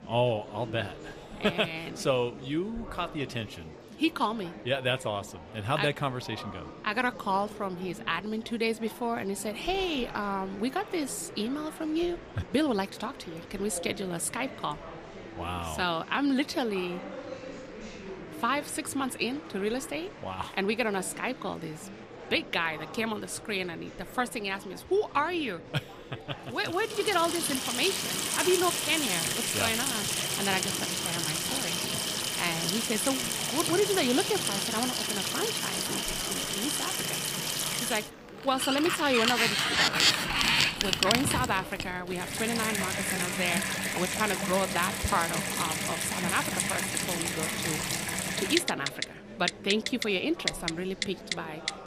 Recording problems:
household noises; very loud; from 27 s on; 2 dB above the speech
murmuring crowd; noticeable; throughout; 15 dB below the speech

